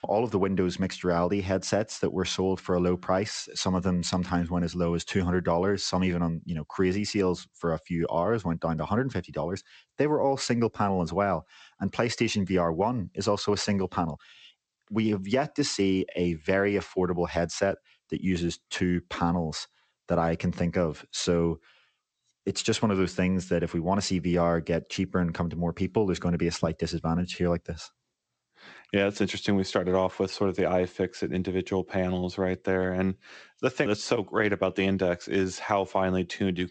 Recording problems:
garbled, watery; slightly; nothing above 8 kHz

